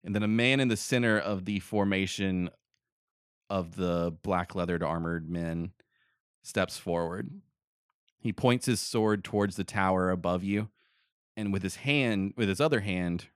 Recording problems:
none

